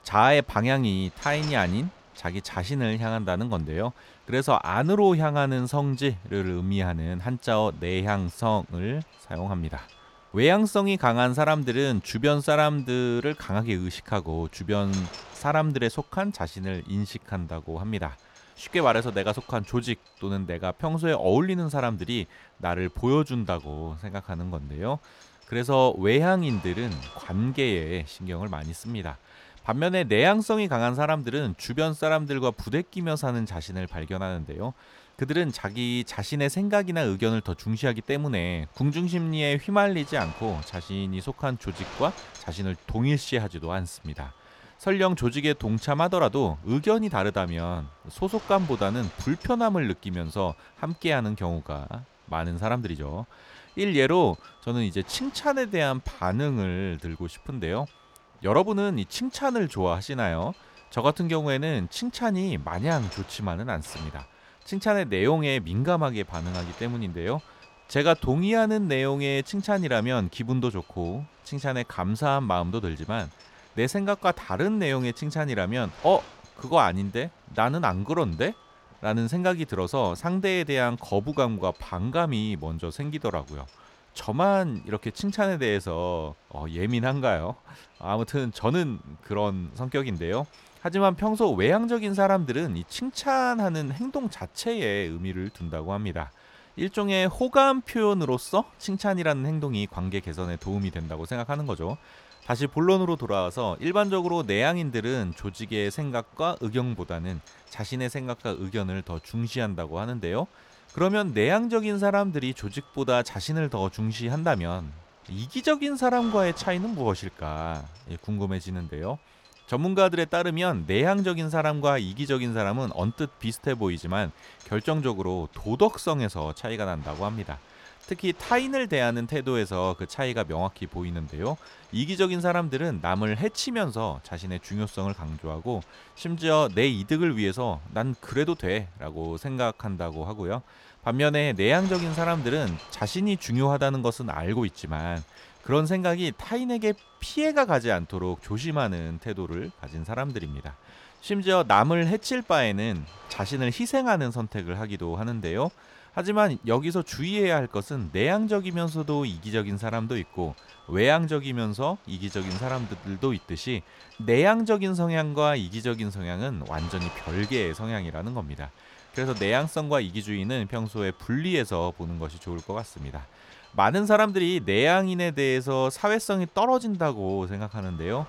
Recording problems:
wind noise on the microphone; occasional gusts; 20 dB below the speech

